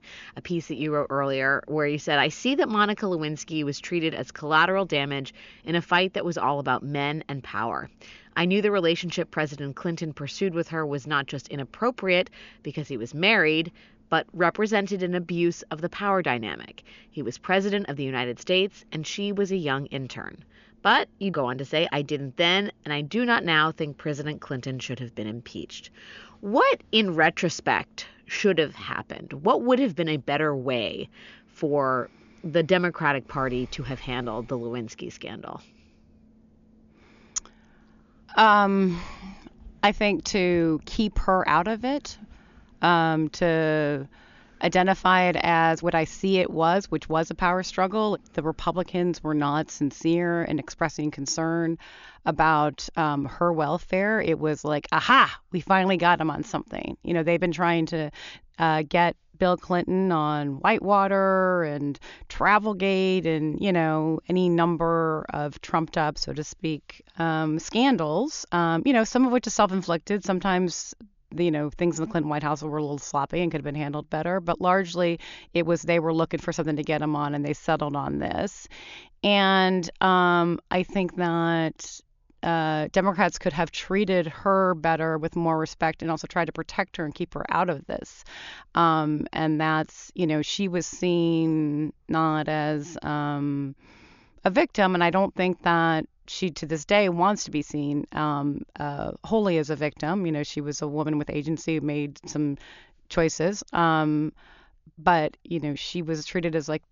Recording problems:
high frequencies cut off; noticeable; nothing above 7 kHz

